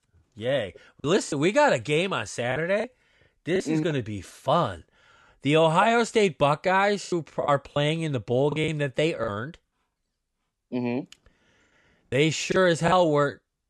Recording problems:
choppy; very; from 1 to 3.5 s, at 7 s and from 8.5 to 13 s; 9% of the speech affected

